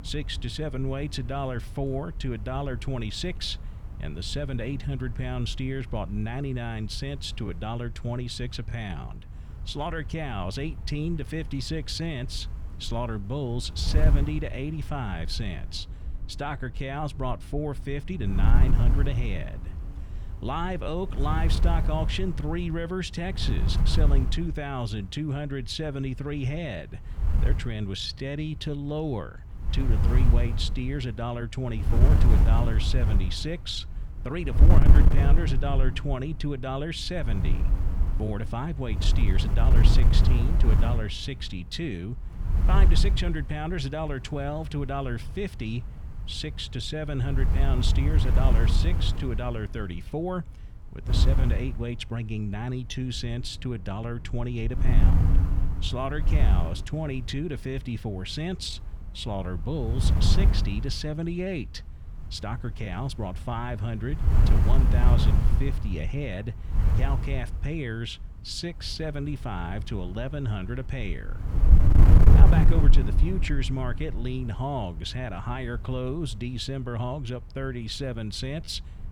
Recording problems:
wind noise on the microphone; heavy; 5 dB below the speech

